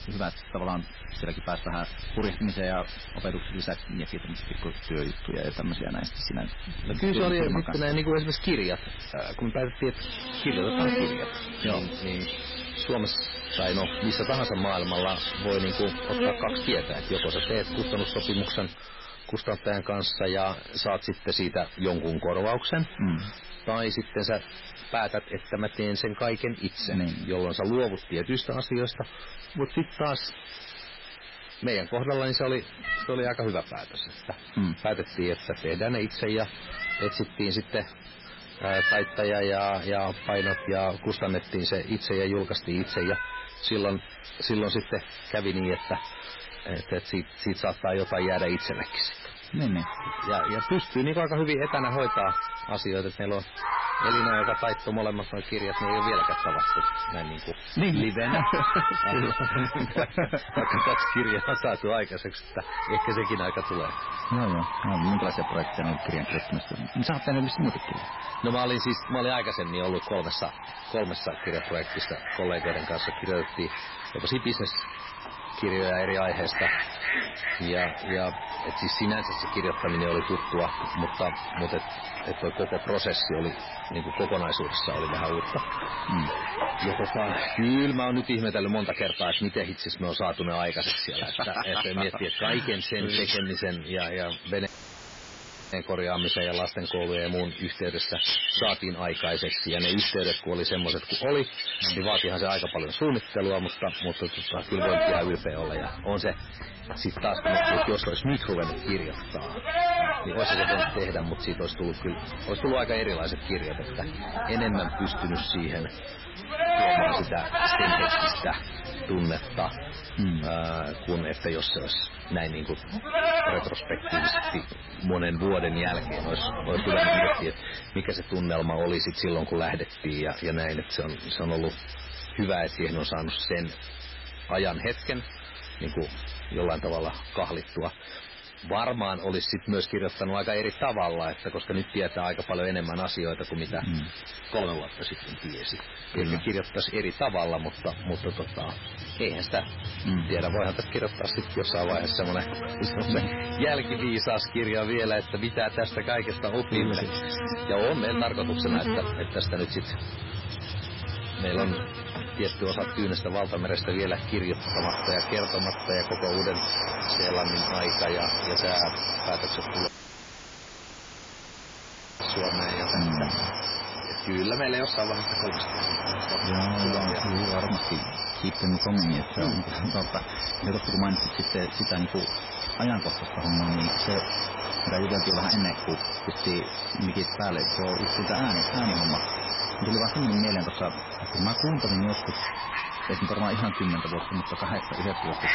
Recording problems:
garbled, watery; badly; nothing above 5.5 kHz
distortion; slight; 5% of the sound clipped
animal sounds; loud; throughout; as loud as the speech
hiss; noticeable; throughout; 10 dB below the speech
audio cutting out; filled with static; at 1:35 for 1 s and at 2:50 for 2.5 s

